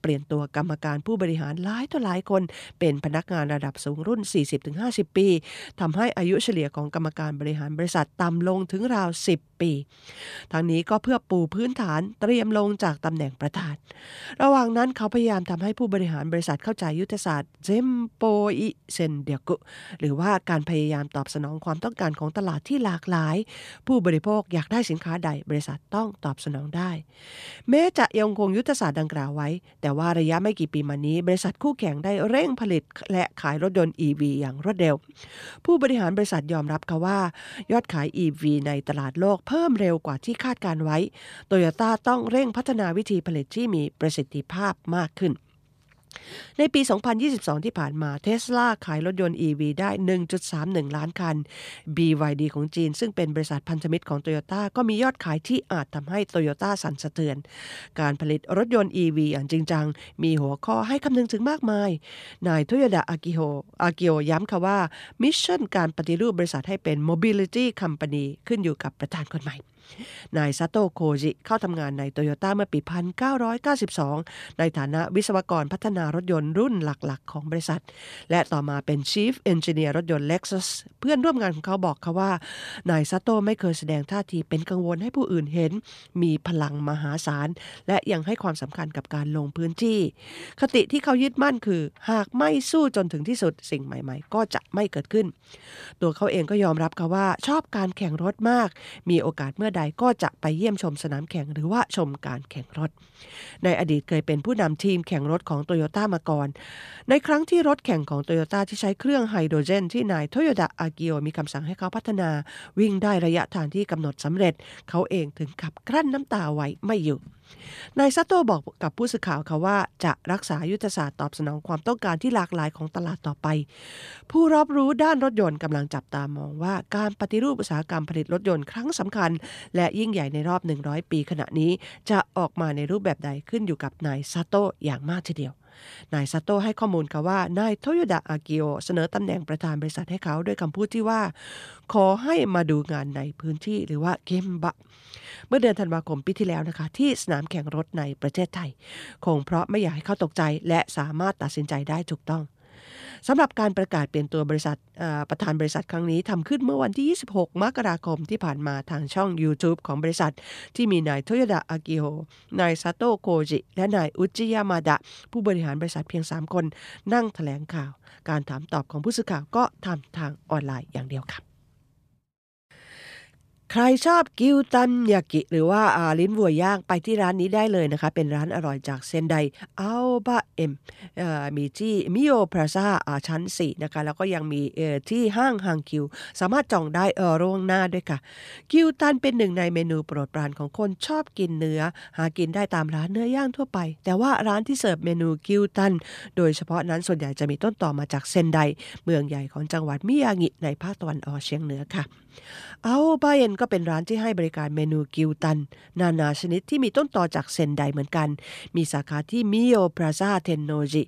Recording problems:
none

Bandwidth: 14.5 kHz